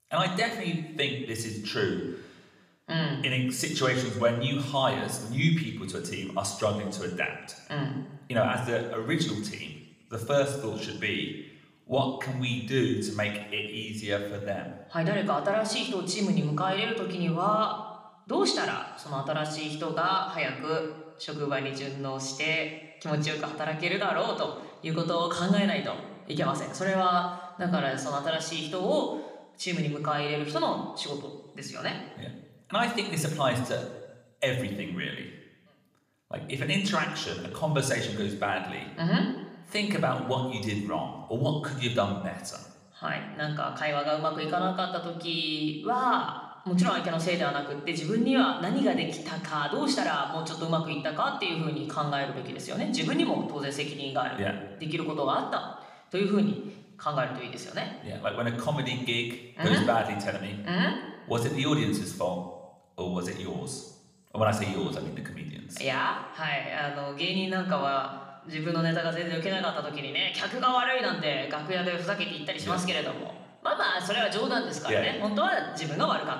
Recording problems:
room echo; slight; dies away in 0.9 s
off-mic speech; somewhat distant

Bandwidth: 14.5 kHz